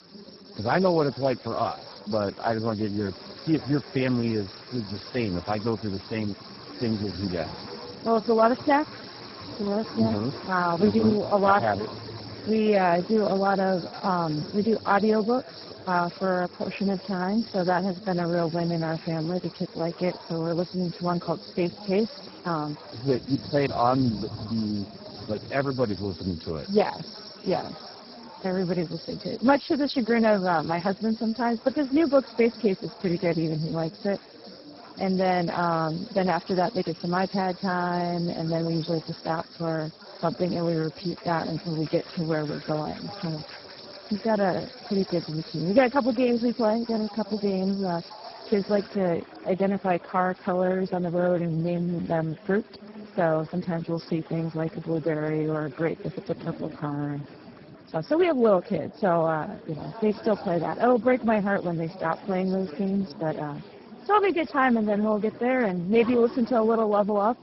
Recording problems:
garbled, watery; badly; nothing above 5.5 kHz
train or aircraft noise; noticeable; throughout; 20 dB below the speech
chatter from many people; noticeable; throughout; 20 dB below the speech
household noises; faint; throughout; 25 dB below the speech
high-pitched whine; very faint; until 49 s; 5.5 kHz, 65 dB below the speech

